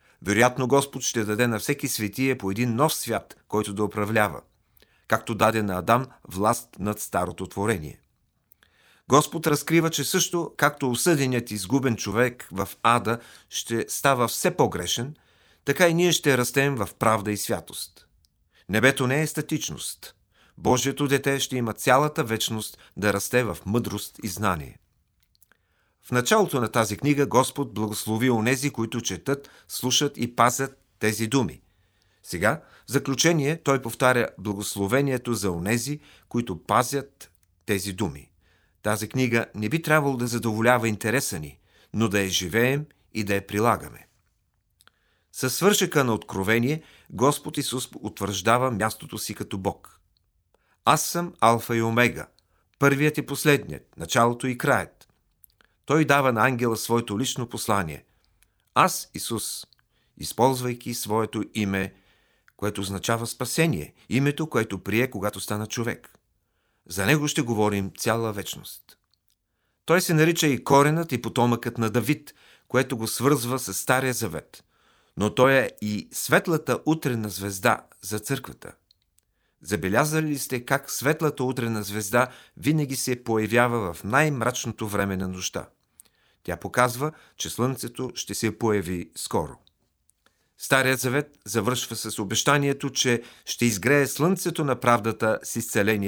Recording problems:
abrupt cut into speech; at the end

